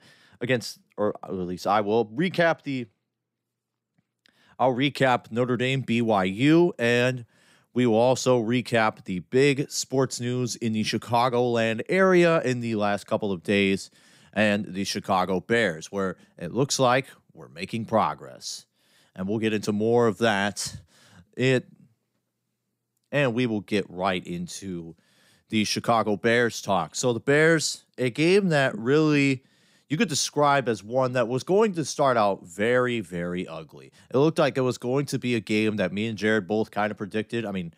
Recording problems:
none

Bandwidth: 15.5 kHz